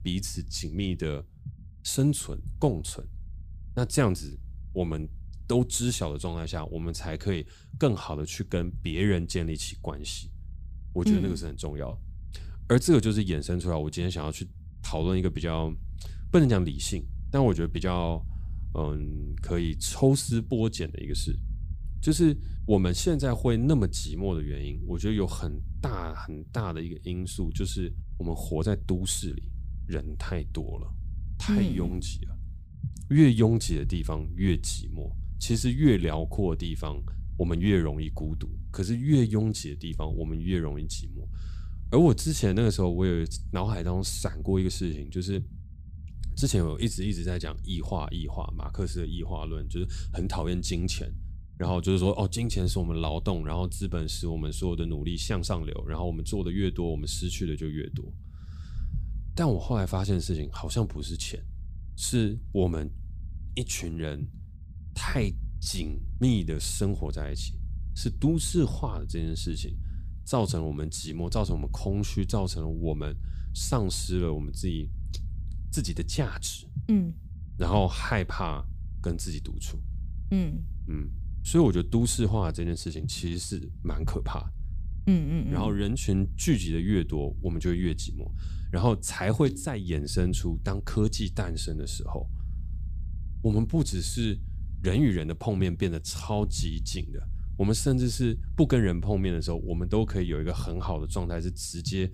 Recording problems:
low rumble; faint; throughout; 20 dB below the speech

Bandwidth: 15 kHz